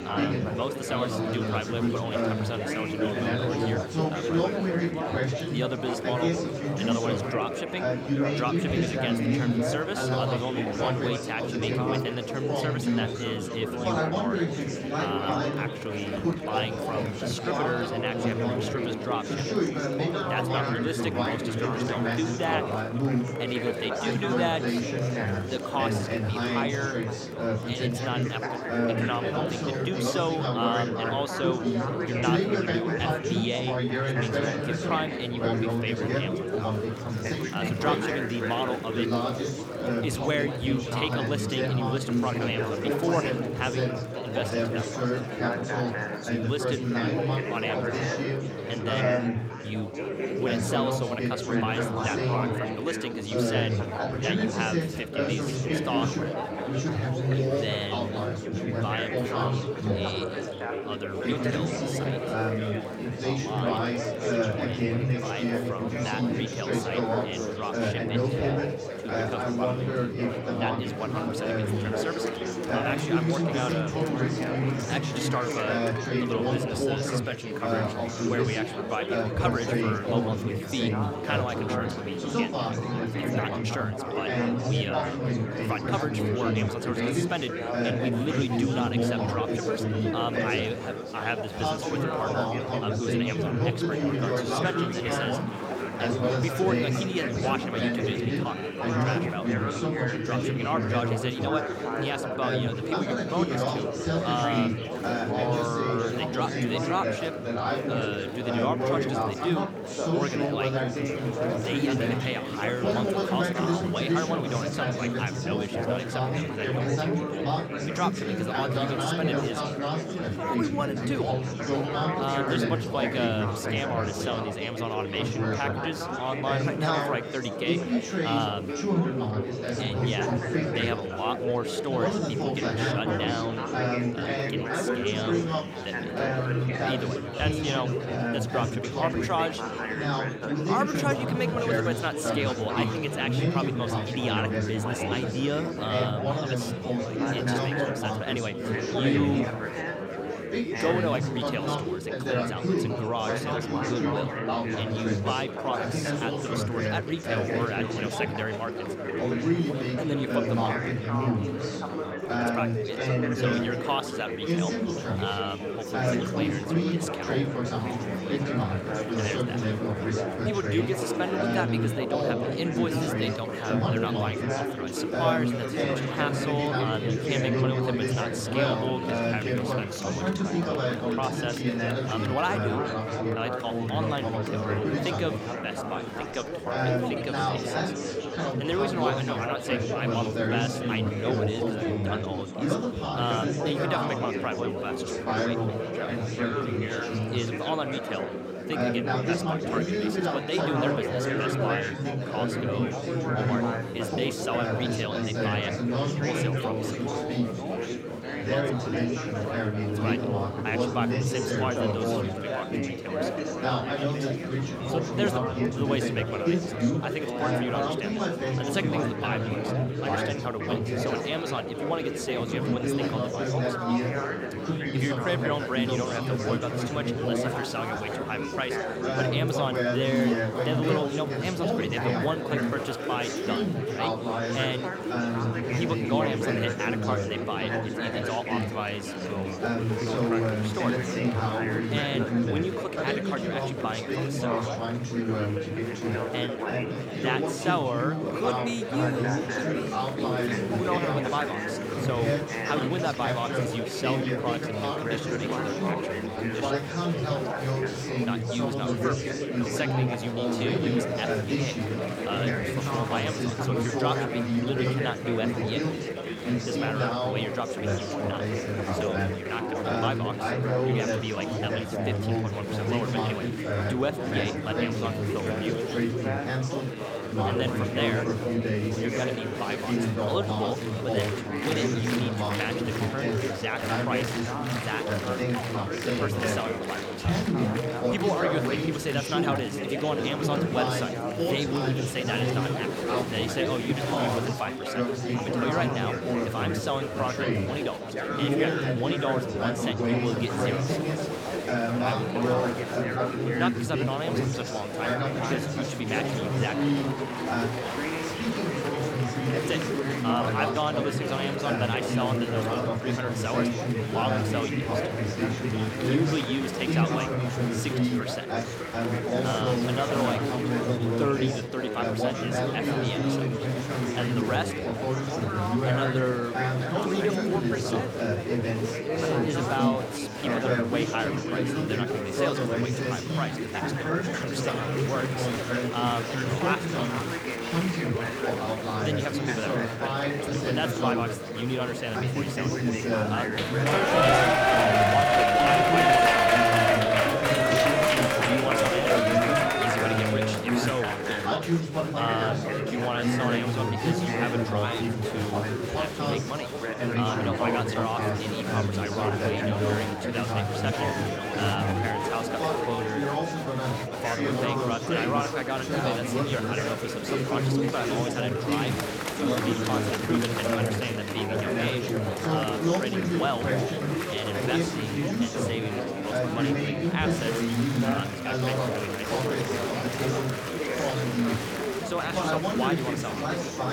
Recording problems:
chatter from many people; very loud; throughout; 5 dB above the speech

